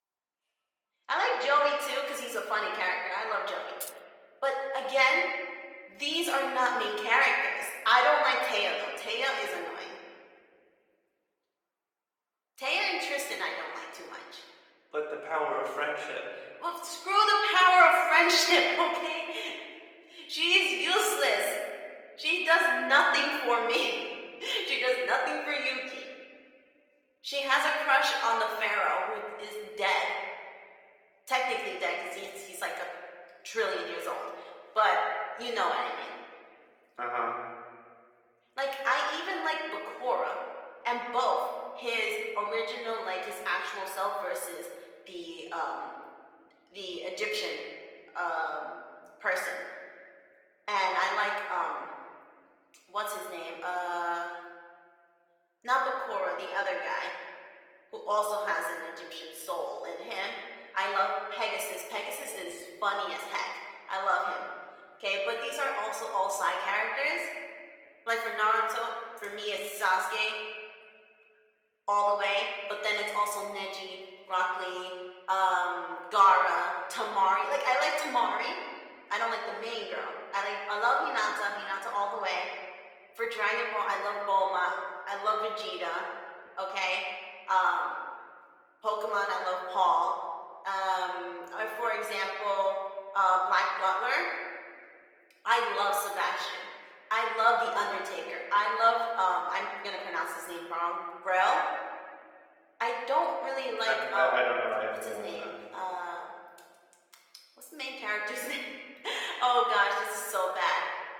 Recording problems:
thin; very; fading below 650 Hz
room echo; noticeable; dies away in 1.5 s
off-mic speech; somewhat distant
garbled, watery; slightly; nothing above 17.5 kHz
jangling keys; faint; at 4 s; peak 15 dB below the speech

